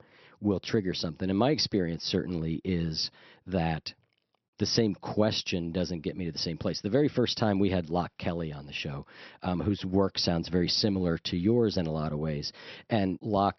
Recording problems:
high frequencies cut off; noticeable; nothing above 6 kHz

